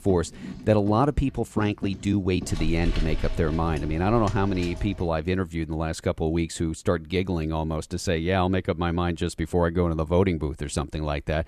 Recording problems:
household noises; noticeable; until 5 s; 10 dB below the speech

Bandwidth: 13.5 kHz